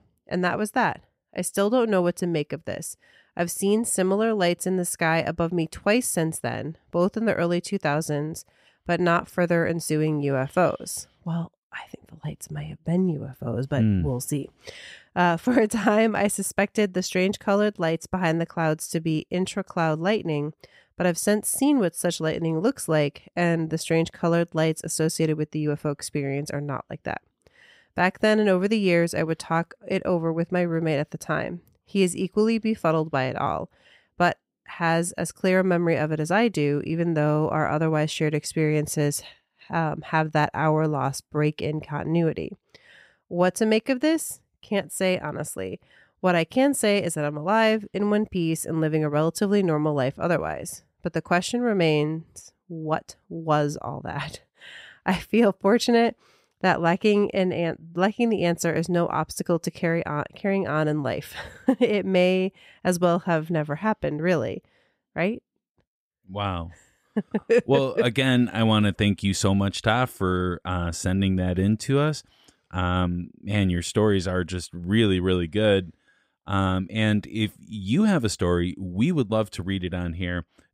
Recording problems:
none

